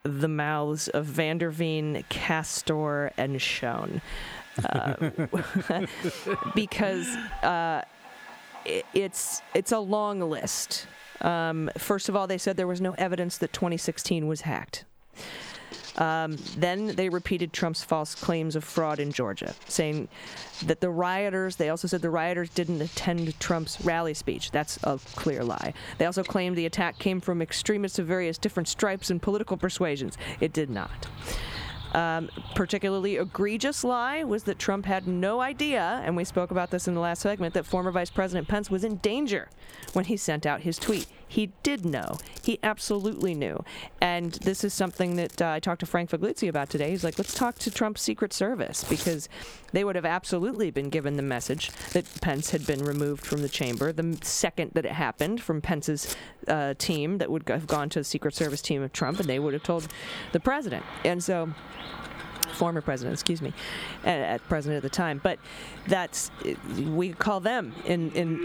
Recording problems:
squashed, flat; somewhat, background pumping
animal sounds; noticeable; throughout; 20 dB below the speech
household noises; noticeable; throughout; 15 dB below the speech

